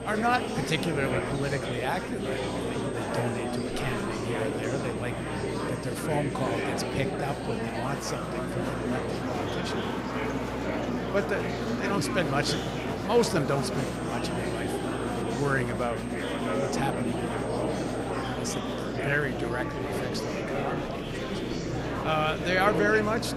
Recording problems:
murmuring crowd; very loud; throughout; as loud as the speech
high-pitched whine; noticeable; until 9 s and from 14 to 18 s; 8.5 kHz, 20 dB below the speech
electrical hum; faint; throughout; 60 Hz, 25 dB below the speech

